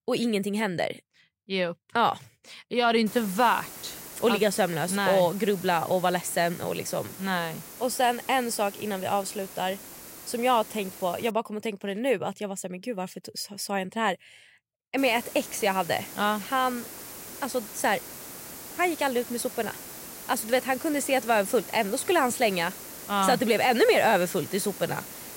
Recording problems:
hiss; noticeable; from 3 to 11 s and from 15 s on; 15 dB below the speech

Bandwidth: 16 kHz